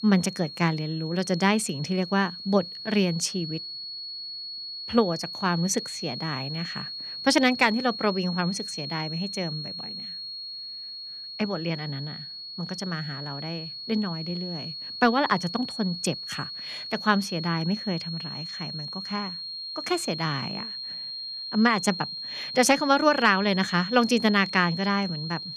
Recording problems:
high-pitched whine; loud; throughout; 4.5 kHz, 8 dB below the speech

